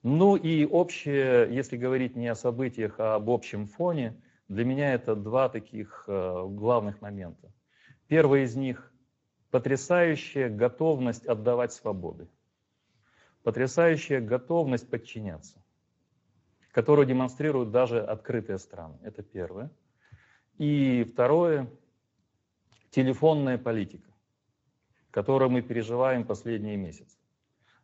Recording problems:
garbled, watery; slightly; nothing above 7.5 kHz
high frequencies cut off; slight

